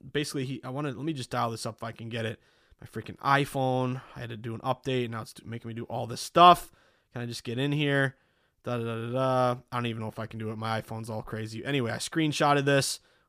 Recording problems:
none

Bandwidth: 15 kHz